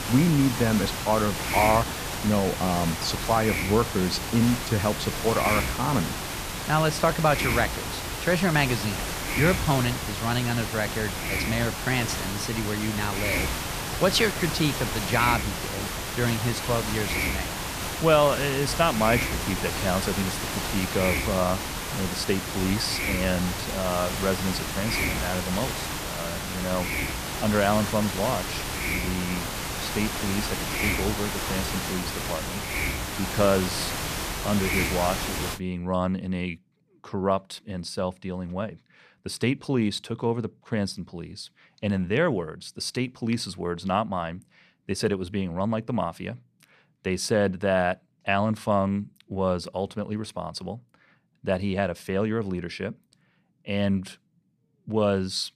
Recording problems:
hiss; loud; until 36 s; 2 dB below the speech

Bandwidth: 14.5 kHz